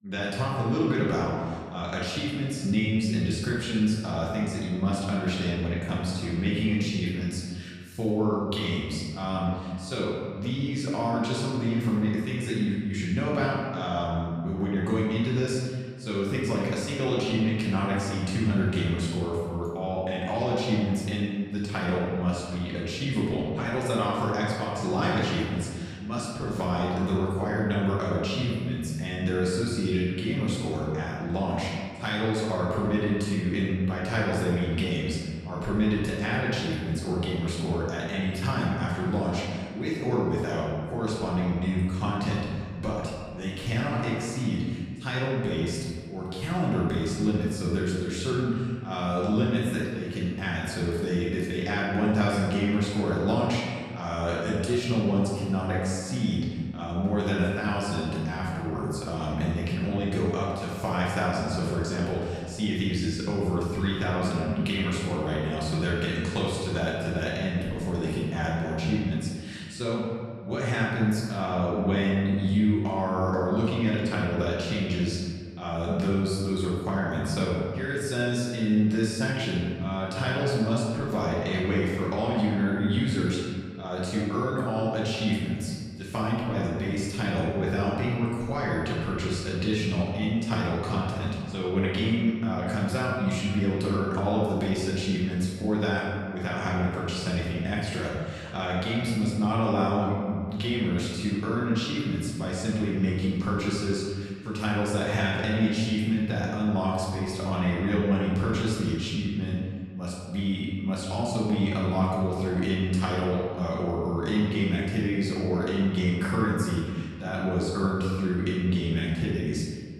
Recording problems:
off-mic speech; far
room echo; noticeable; dies away in 1.7 s

